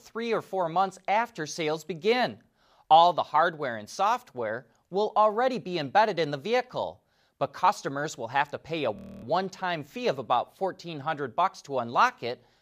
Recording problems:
audio freezing; at 9 s

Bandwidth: 15 kHz